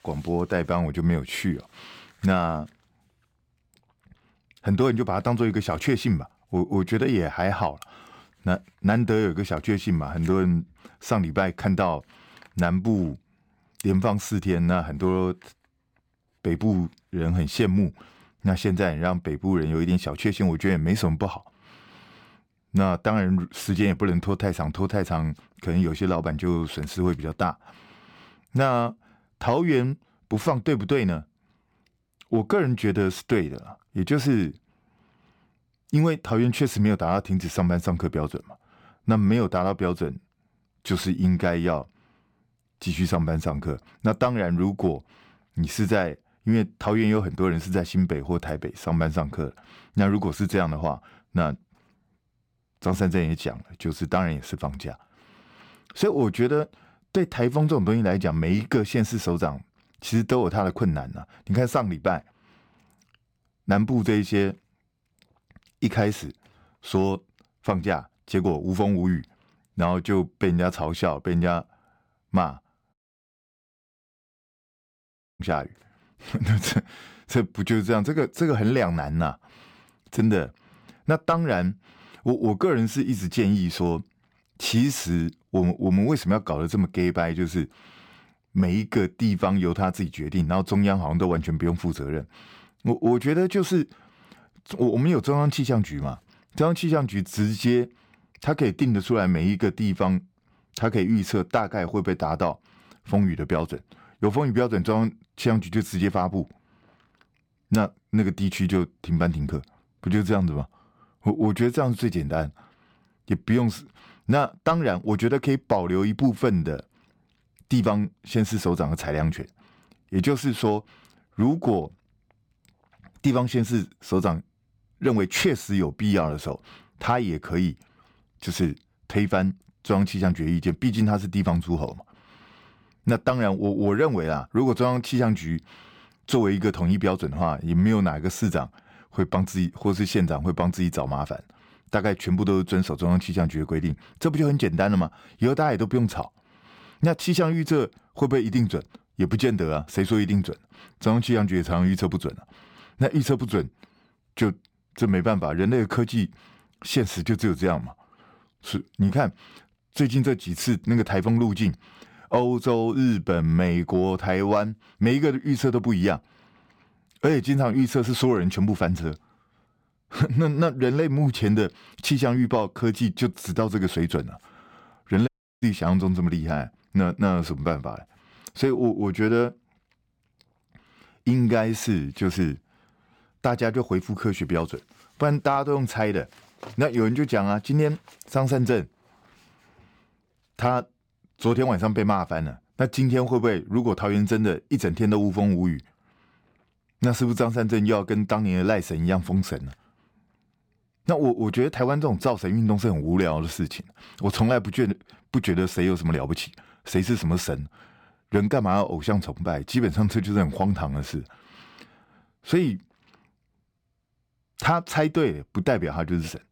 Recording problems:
audio cutting out; at 1:13 for 2.5 s and at 2:55

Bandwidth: 17.5 kHz